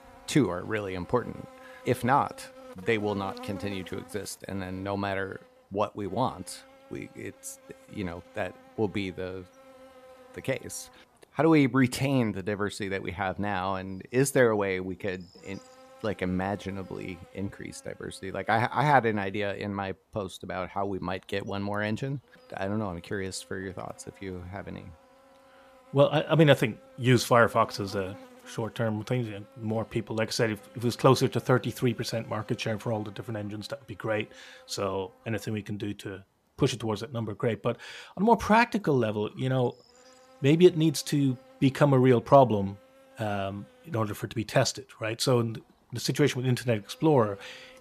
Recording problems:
electrical hum; faint; throughout; 60 Hz, 25 dB below the speech

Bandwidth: 14.5 kHz